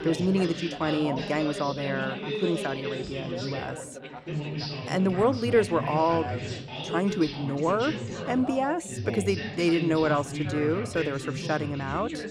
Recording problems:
background chatter; loud; throughout; 3 voices, 6 dB below the speech

